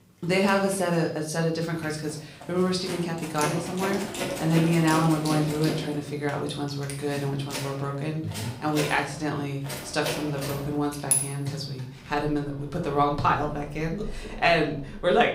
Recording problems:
room echo; slight; dies away in 0.4 s
off-mic speech; somewhat distant
household noises; loud; throughout; 6 dB below the speech

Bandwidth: 15.5 kHz